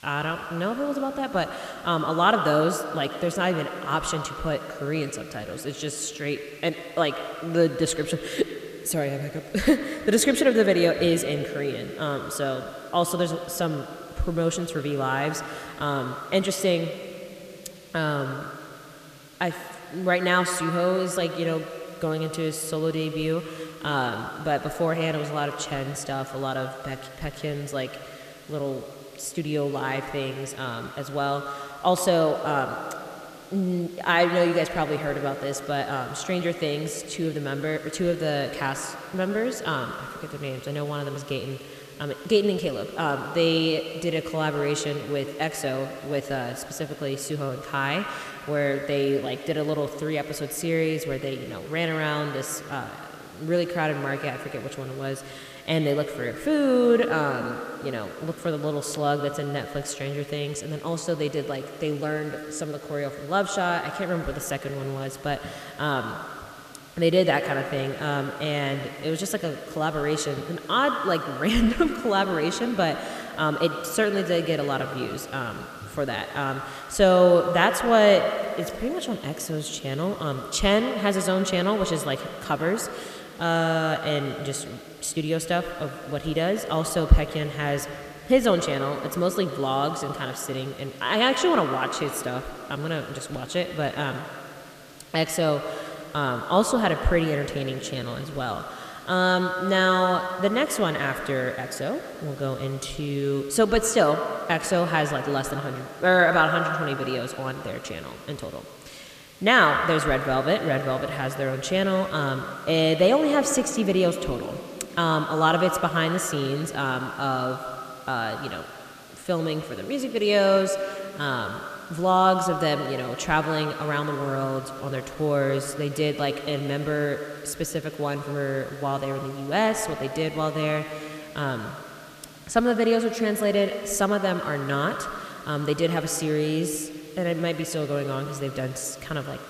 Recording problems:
echo of what is said; strong; throughout; 90 ms later, 8 dB below the speech
hiss; faint; throughout; 25 dB below the speech

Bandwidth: 14.5 kHz